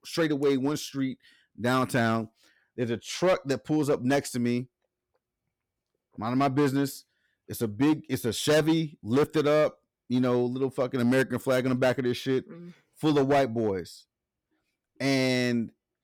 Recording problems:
distortion; slight; 6% of the sound clipped

